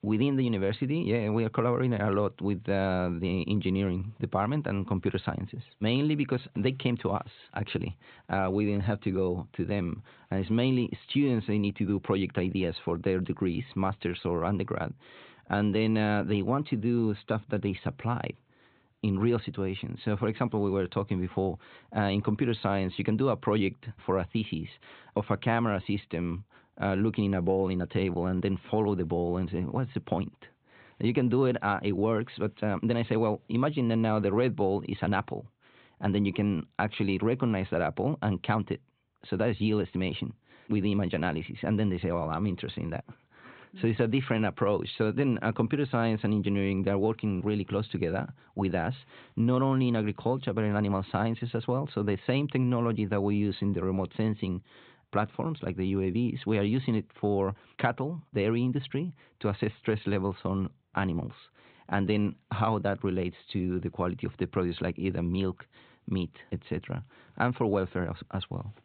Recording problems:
high frequencies cut off; severe; nothing above 4 kHz

